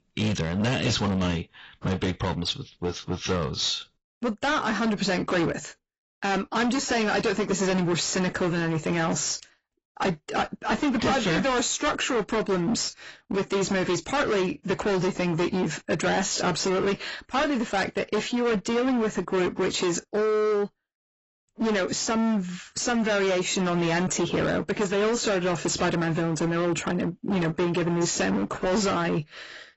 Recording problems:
distortion; heavy; 23% of the sound clipped
garbled, watery; badly; nothing above 7.5 kHz

